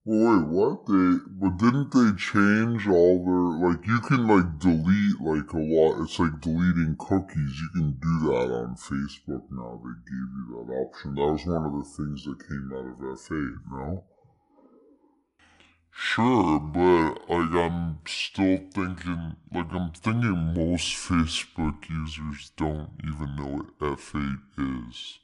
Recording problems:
wrong speed and pitch; too slow and too low; 0.6 times normal speed

